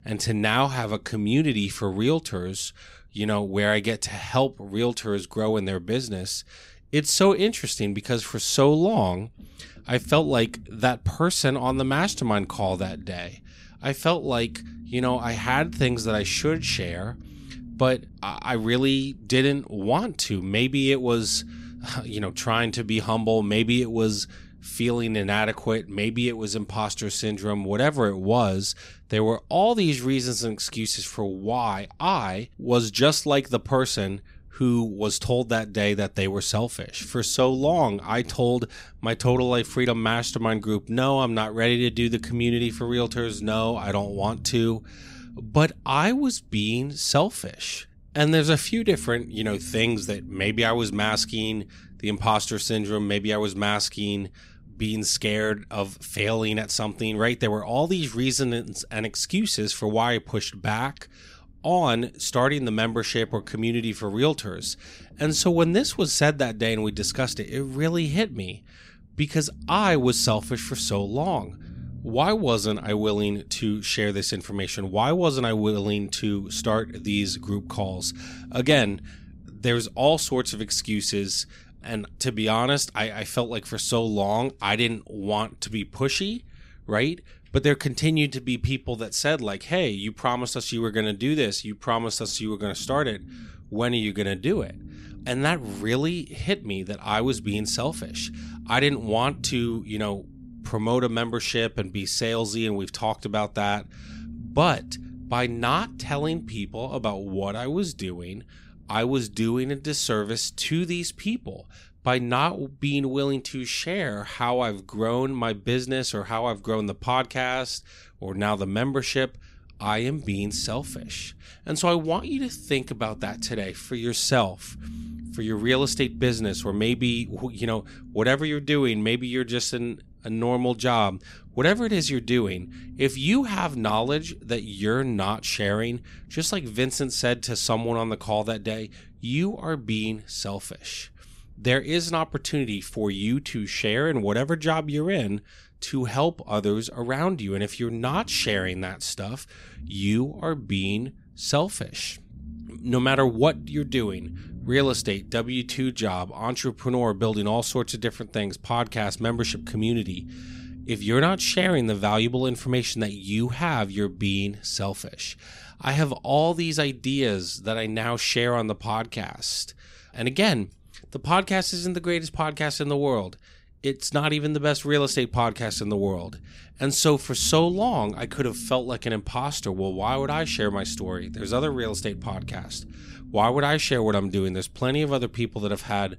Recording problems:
low rumble; faint; throughout; 25 dB below the speech

